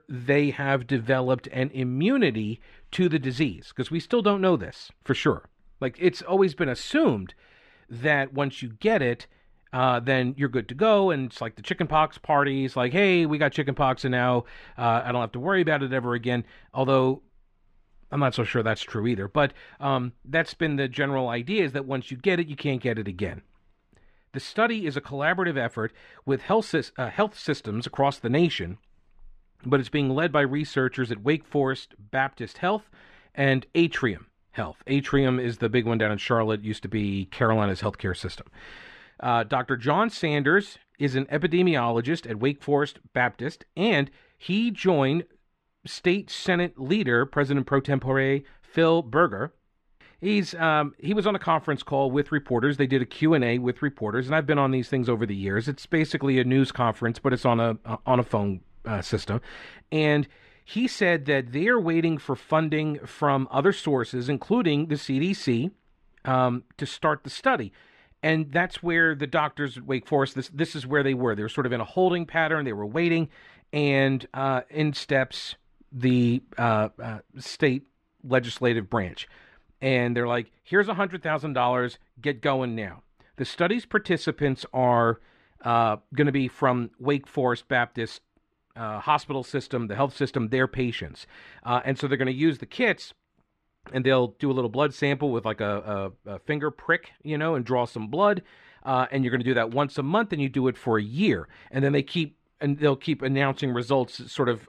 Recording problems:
muffled; slightly; fading above 2.5 kHz

